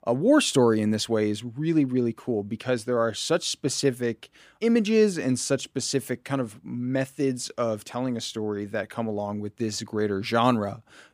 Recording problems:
none

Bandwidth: 15 kHz